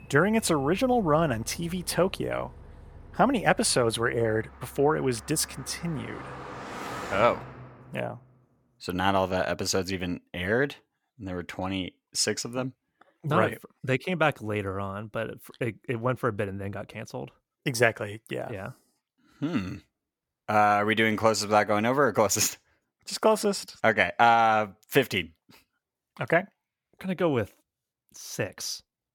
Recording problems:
traffic noise; noticeable; until 7.5 s; 15 dB below the speech

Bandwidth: 18 kHz